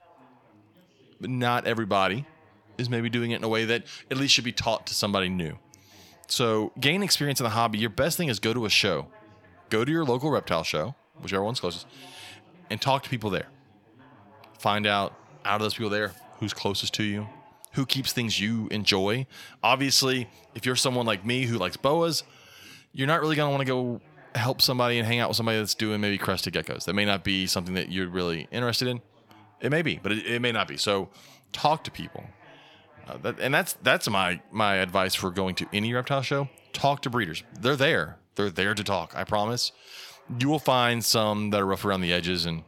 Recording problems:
background chatter; faint; throughout; 4 voices, 30 dB below the speech

